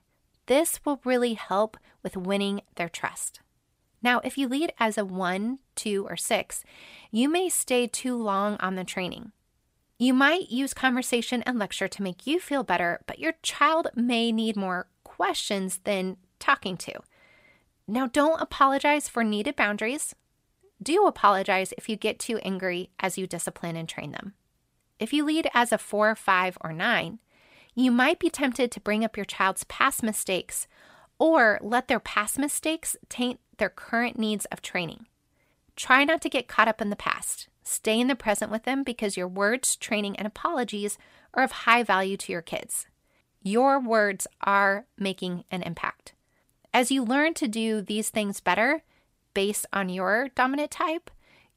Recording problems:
none

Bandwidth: 15.5 kHz